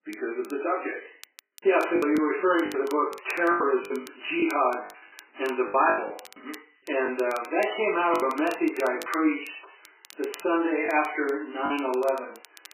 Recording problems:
off-mic speech; far
garbled, watery; badly; nothing above 2.5 kHz
room echo; noticeable; dies away in 0.5 s
thin; somewhat; fading below 300 Hz
crackle, like an old record; faint; 25 dB below the speech
choppy; very; 9% of the speech affected

